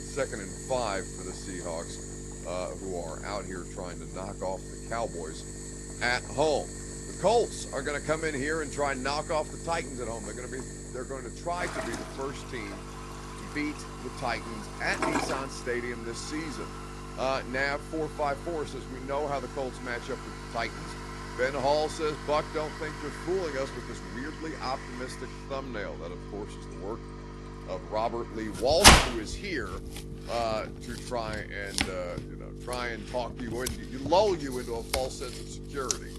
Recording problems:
garbled, watery; slightly; nothing above 11.5 kHz
household noises; very loud; throughout; as loud as the speech
electrical hum; noticeable; throughout; 50 Hz, 15 dB below the speech

